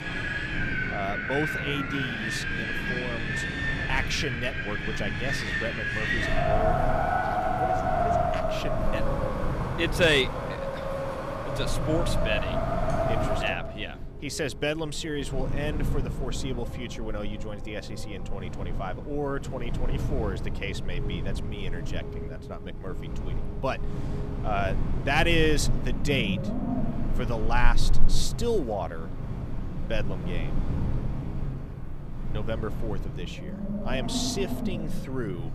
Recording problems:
wind in the background; very loud; throughout; 1 dB above the speech

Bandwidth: 14.5 kHz